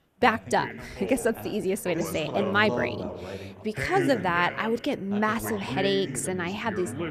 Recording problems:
background chatter; loud; throughout; 2 voices, 7 dB below the speech

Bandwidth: 14.5 kHz